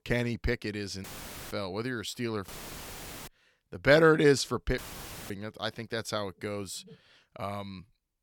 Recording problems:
audio cutting out; filled with static; at 1 s, at 2.5 s for 1 s and at 5 s for 0.5 s

